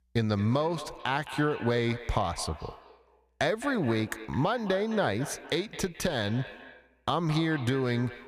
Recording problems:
echo of what is said; noticeable; throughout; 210 ms later, 15 dB below the speech

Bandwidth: 14.5 kHz